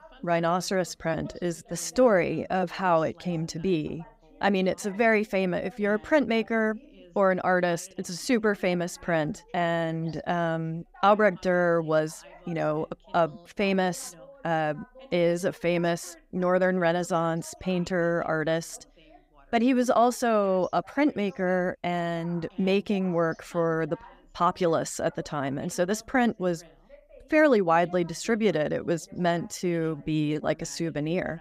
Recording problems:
background chatter; faint; throughout; 2 voices, 25 dB below the speech

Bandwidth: 15.5 kHz